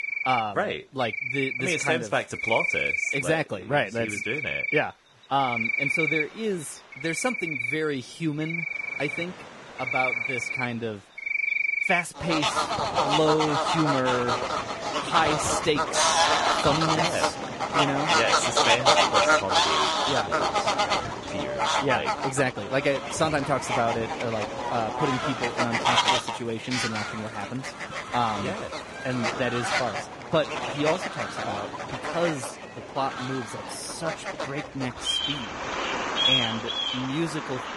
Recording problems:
garbled, watery; badly; nothing above 10.5 kHz
animal sounds; very loud; throughout; 3 dB above the speech
rain or running water; faint; throughout; 25 dB below the speech
crackling; faint; from 2 to 3 s and from 25 to 29 s; 25 dB below the speech

